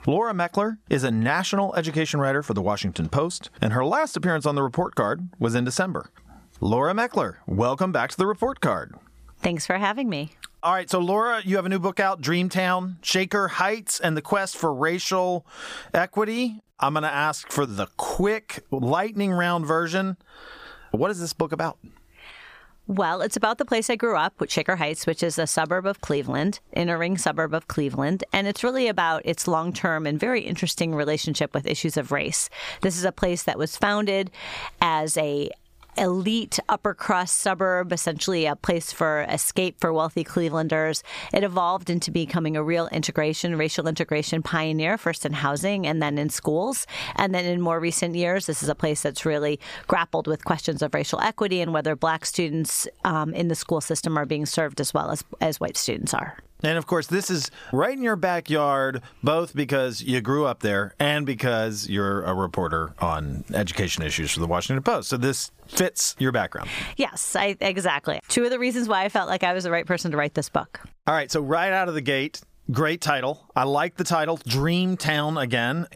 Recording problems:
squashed, flat; somewhat

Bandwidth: 15 kHz